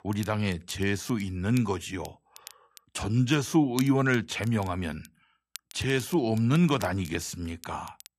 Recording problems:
crackle, like an old record; noticeable; 20 dB below the speech

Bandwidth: 14 kHz